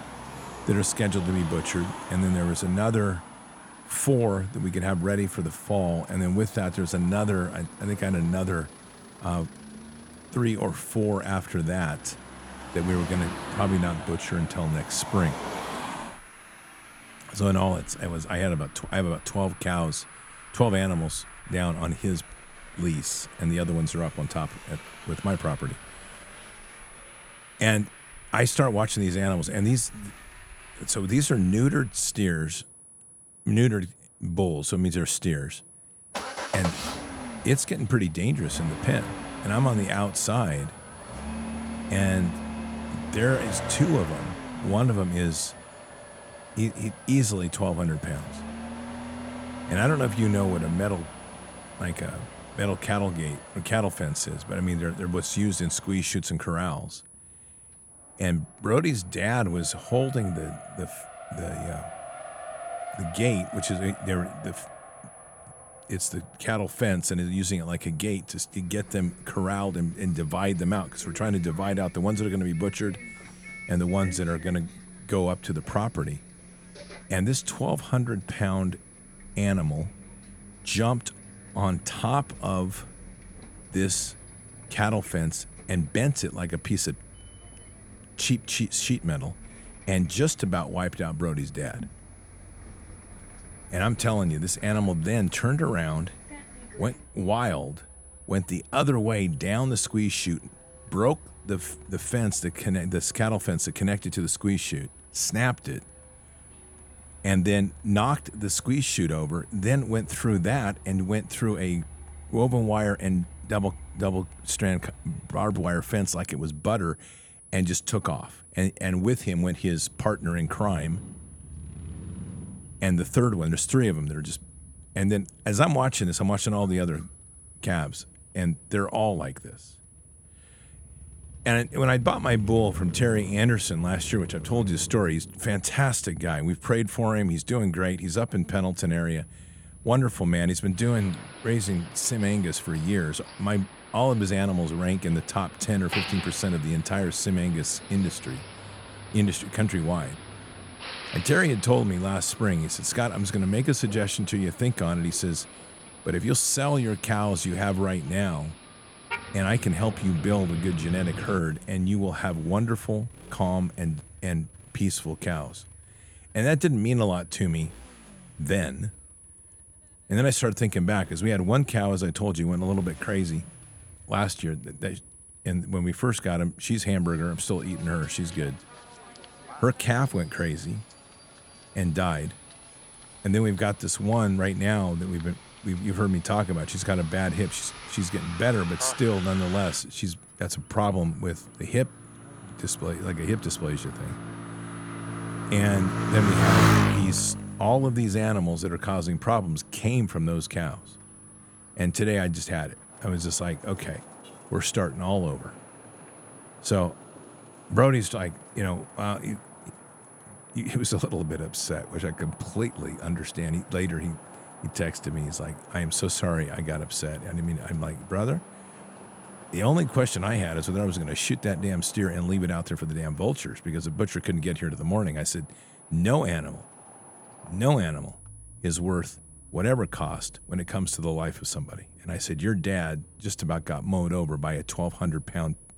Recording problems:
traffic noise; noticeable; throughout; 10 dB below the speech
high-pitched whine; faint; throughout; 10 kHz, 25 dB below the speech

